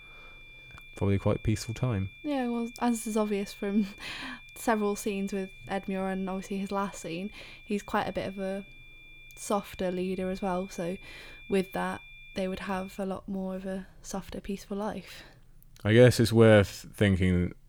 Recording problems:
high-pitched whine; noticeable; until 13 s; 2.5 kHz, 20 dB below the speech

